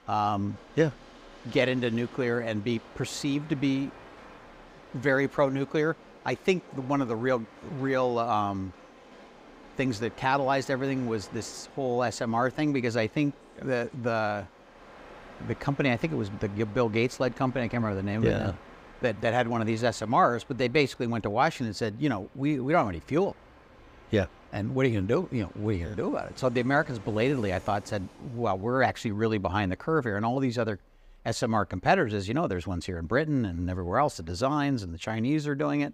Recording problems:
train or aircraft noise; faint; throughout; 20 dB below the speech

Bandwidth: 15.5 kHz